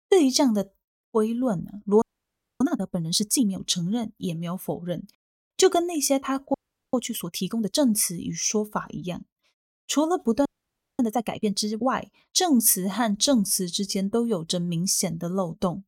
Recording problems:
audio freezing; at 2 s for 0.5 s, at 6.5 s and at 10 s for 0.5 s

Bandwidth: 16.5 kHz